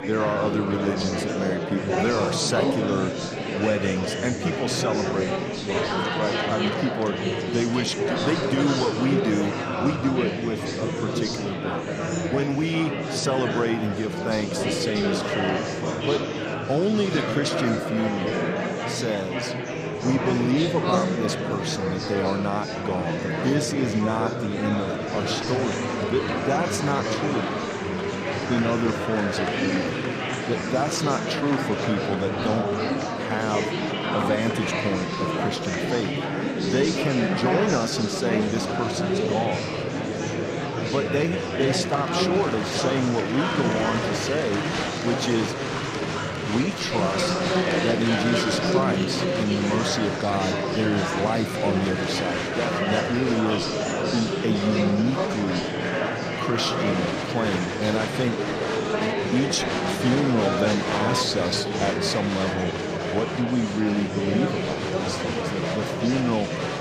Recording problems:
murmuring crowd; very loud; throughout; 1 dB above the speech

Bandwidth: 14.5 kHz